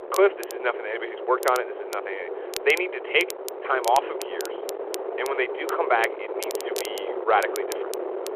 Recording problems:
phone-call audio
wind noise on the microphone; heavy; 9 dB below the speech
crackle, like an old record; noticeable; 15 dB below the speech

